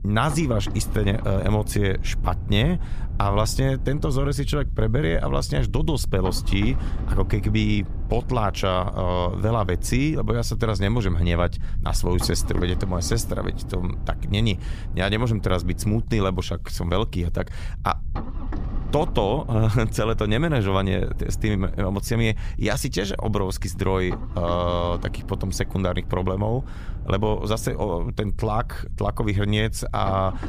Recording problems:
low rumble; noticeable; throughout; 15 dB below the speech

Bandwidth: 15 kHz